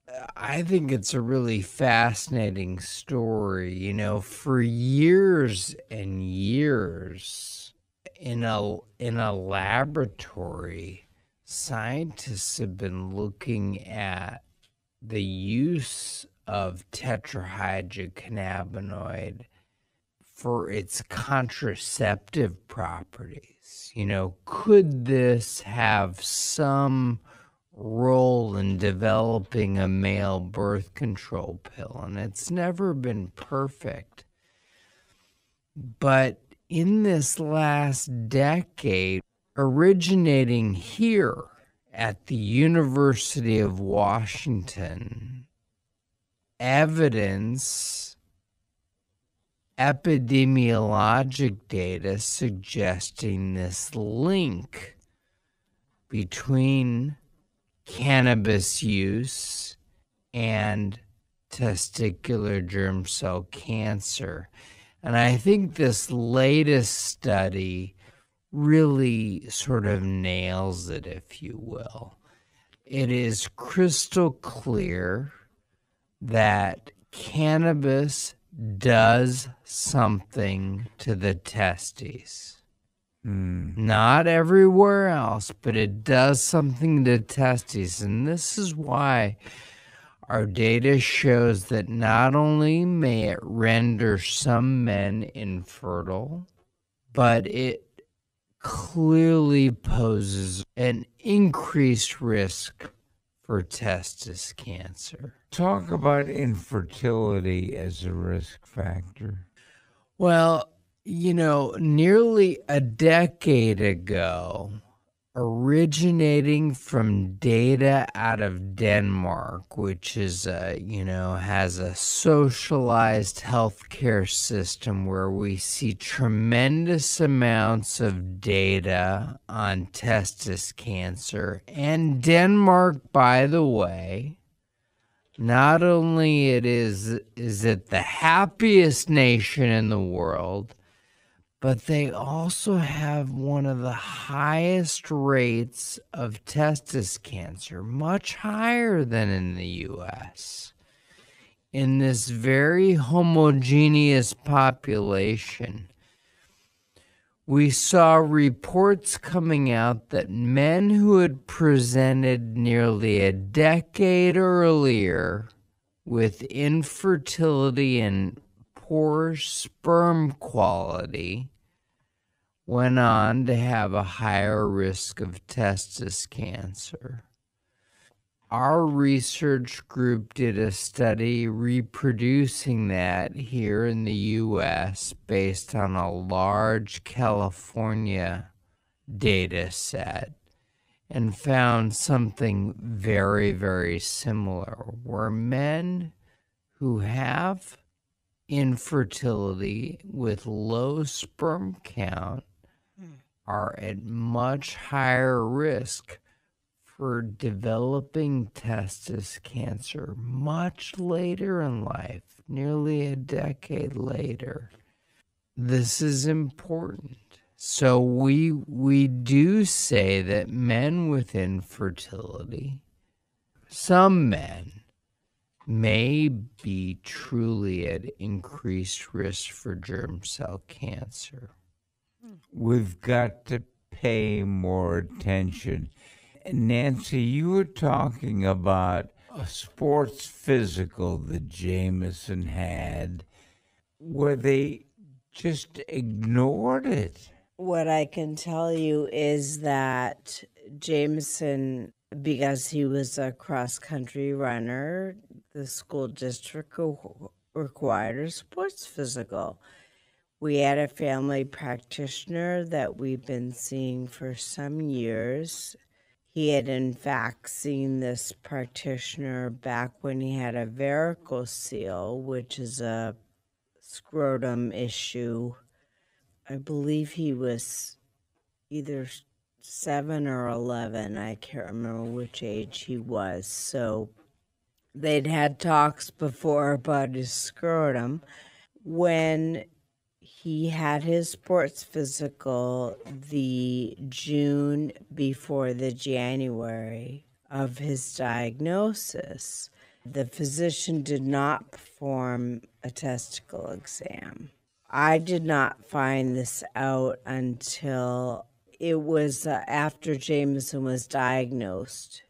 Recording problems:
wrong speed, natural pitch; too slow; 0.5 times normal speed

